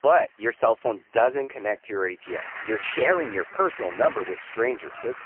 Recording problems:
phone-call audio; poor line; nothing above 3 kHz
traffic noise; noticeable; throughout; 10 dB below the speech
choppy; occasionally; at 1.5 s and at 3 s; 3% of the speech affected

